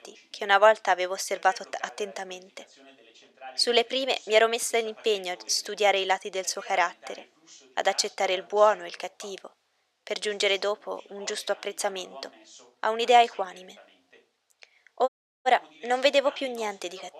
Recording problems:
thin; very; fading below 600 Hz
voice in the background; faint; throughout; 25 dB below the speech
audio cutting out; at 15 s

